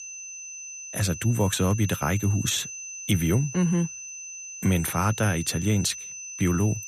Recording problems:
high-pitched whine; noticeable; throughout; 6 kHz, 10 dB below the speech

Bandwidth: 14.5 kHz